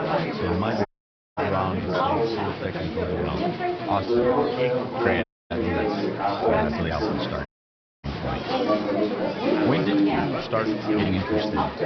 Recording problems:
high frequencies cut off; noticeable; nothing above 5.5 kHz
chatter from many people; very loud; throughout; 5 dB above the speech
audio cutting out; at 1 s for 0.5 s, at 5 s and at 7.5 s for 0.5 s
uneven, jittery; strongly; from 1.5 to 11 s

